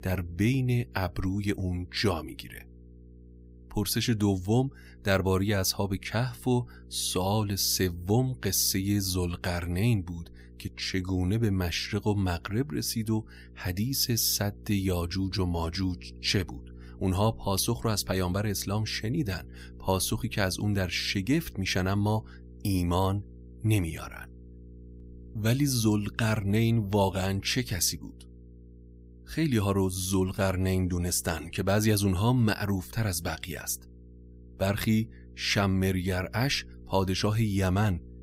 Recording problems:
electrical hum; faint; throughout; 60 Hz, 30 dB below the speech

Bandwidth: 15.5 kHz